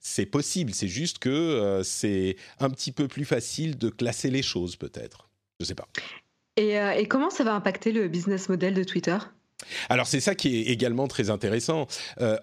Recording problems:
none

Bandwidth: 14 kHz